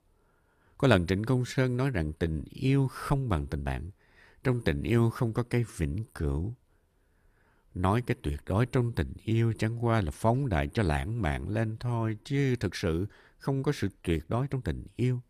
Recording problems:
uneven, jittery; strongly; from 0.5 to 15 s

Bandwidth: 14.5 kHz